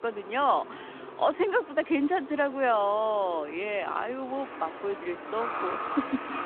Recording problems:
phone-call audio
traffic noise; loud; throughout; 10 dB below the speech

